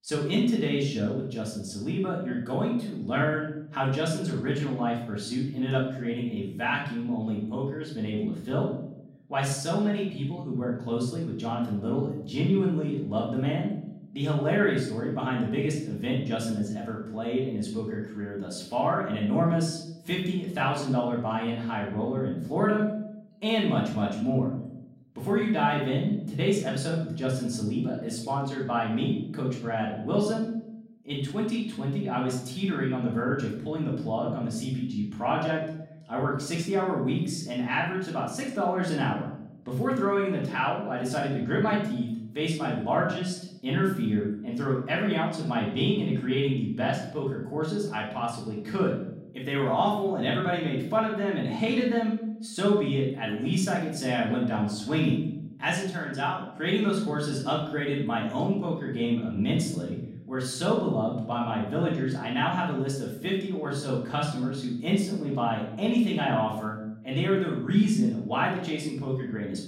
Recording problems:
off-mic speech; far
room echo; noticeable; dies away in 0.7 s

